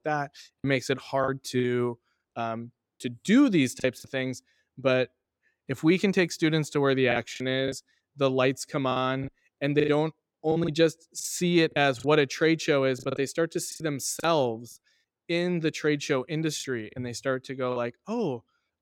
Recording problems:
choppy; very; 7% of the speech affected

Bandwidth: 17 kHz